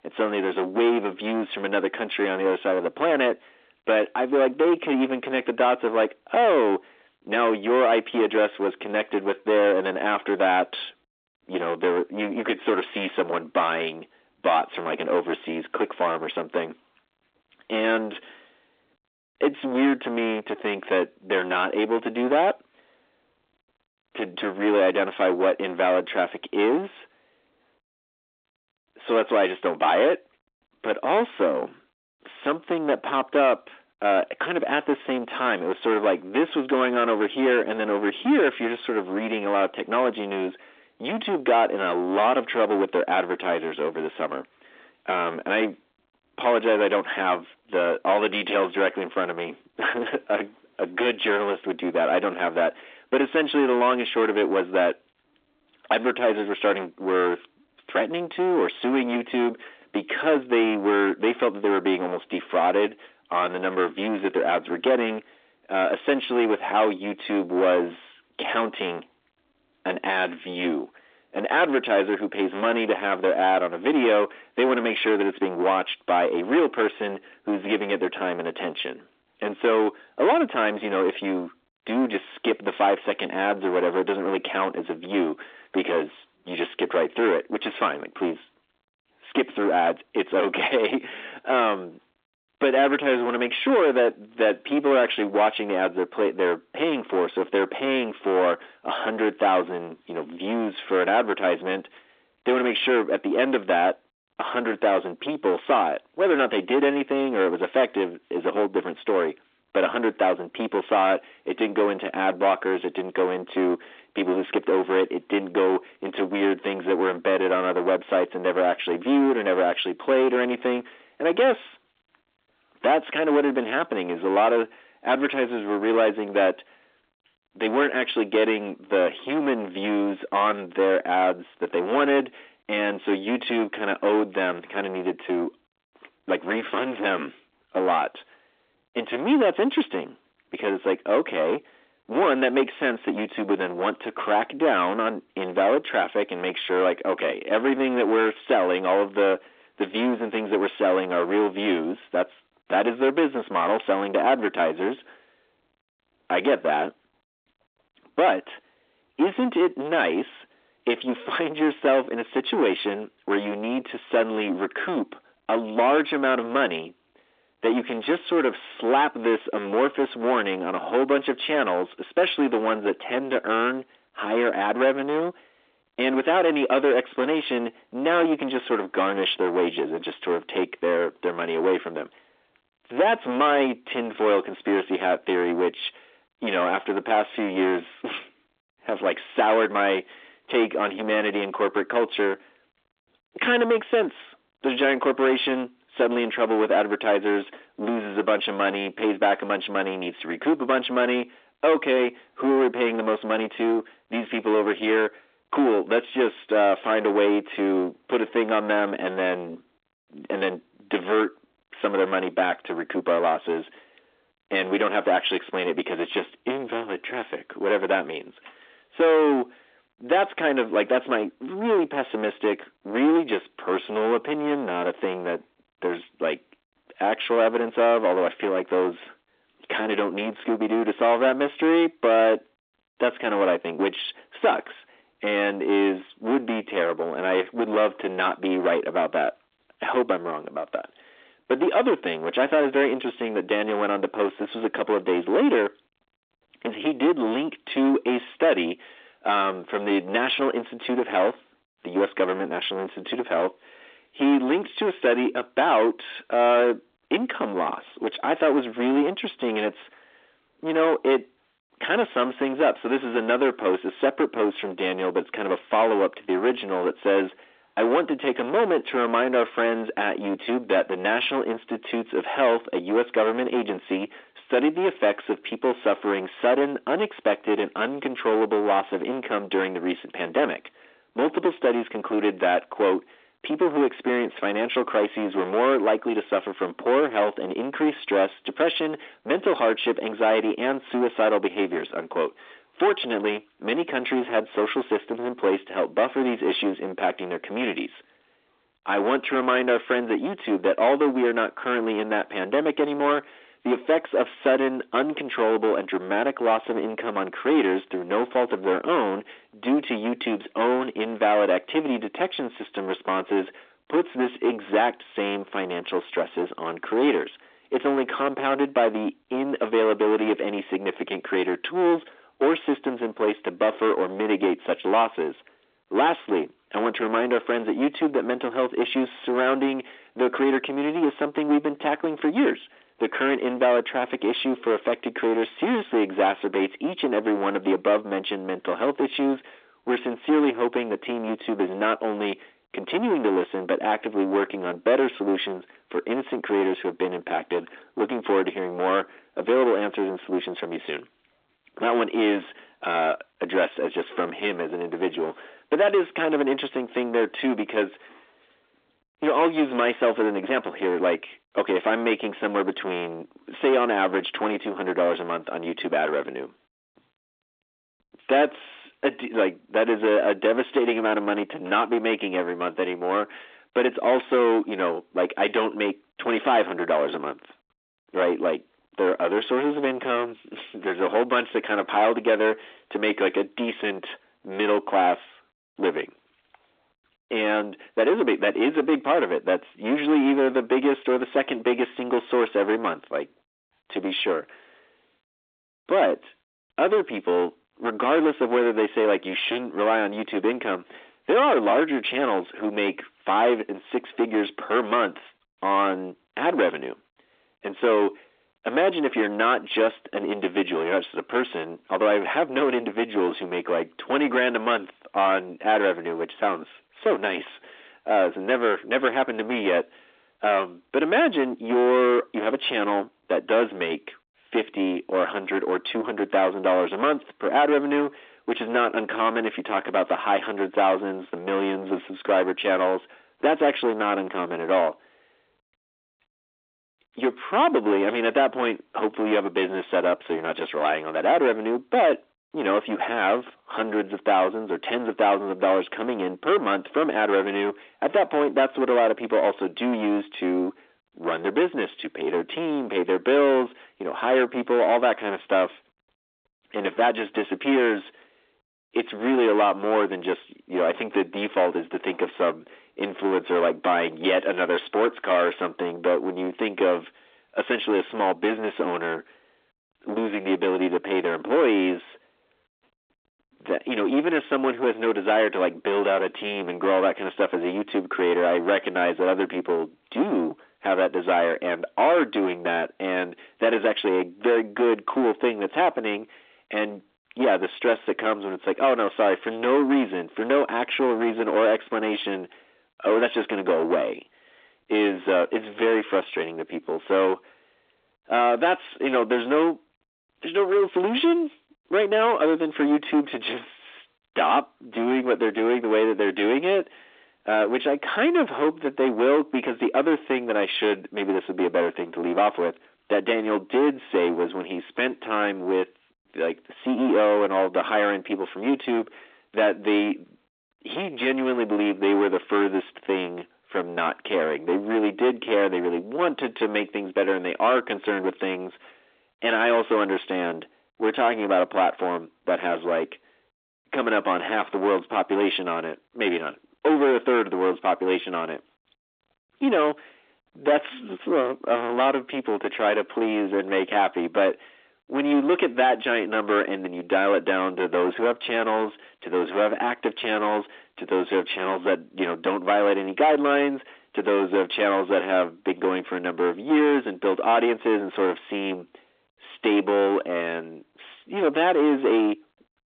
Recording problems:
distortion; heavy; 8 dB below the speech
phone-call audio

